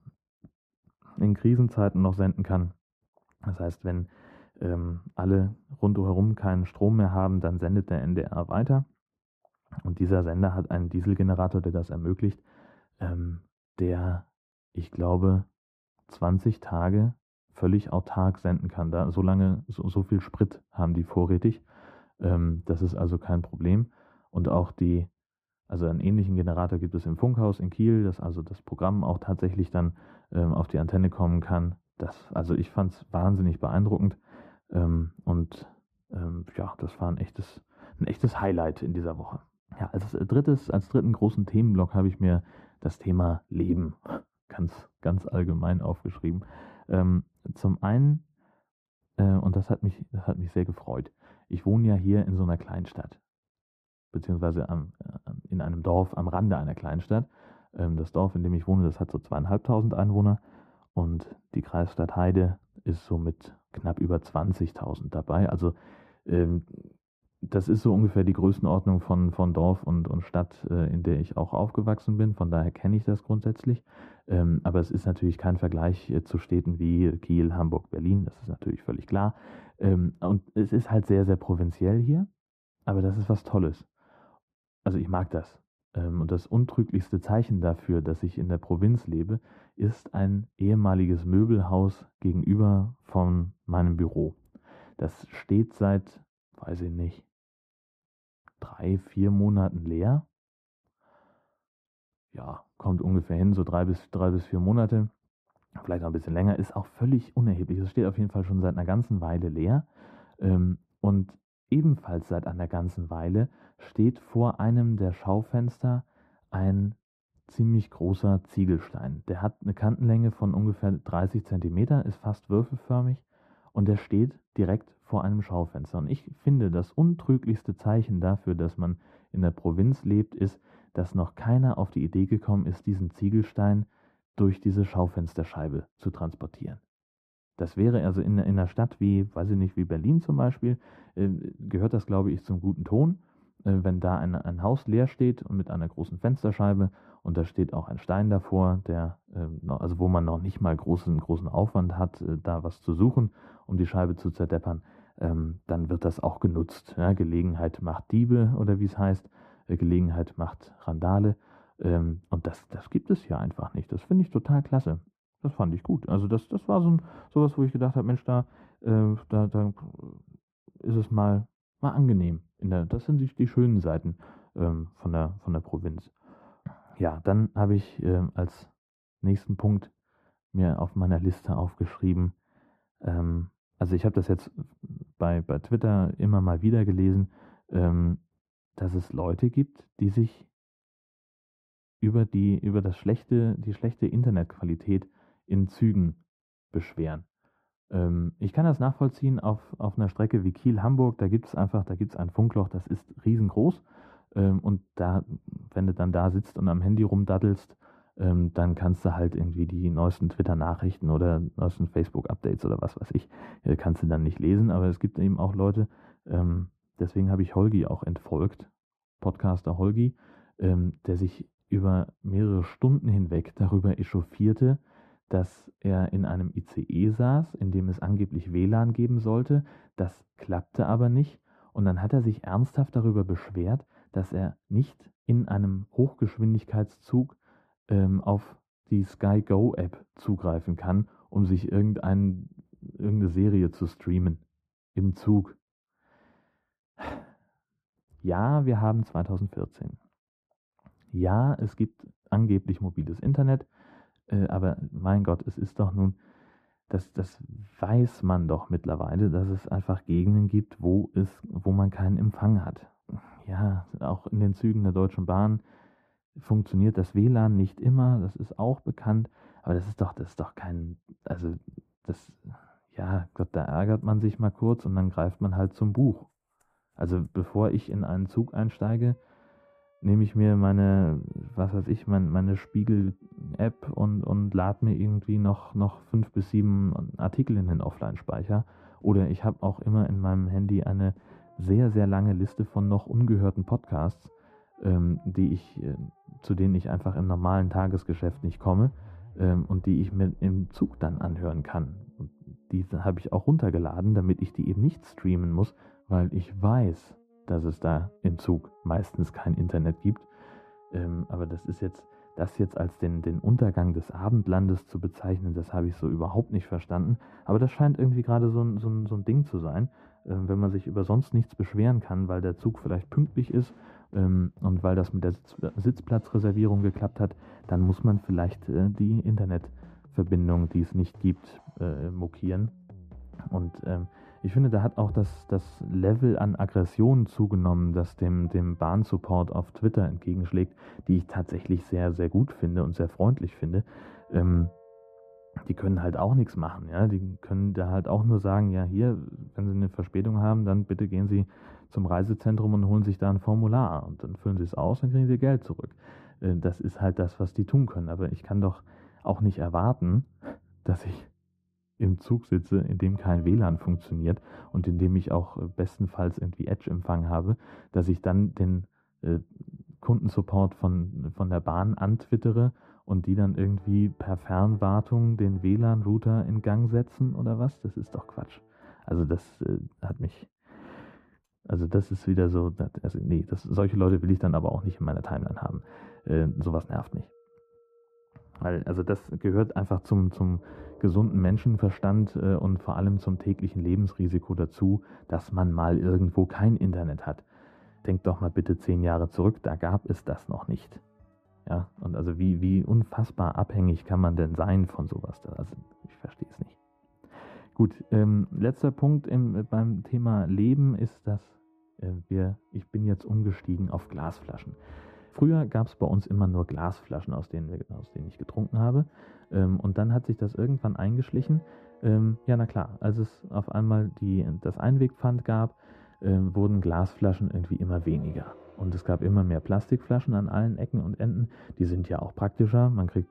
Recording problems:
muffled; very; fading above 2 kHz
background music; faint; from 4:33 on; 30 dB below the speech

